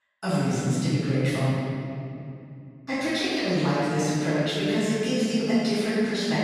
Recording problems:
room echo; strong; dies away in 2.6 s
off-mic speech; far

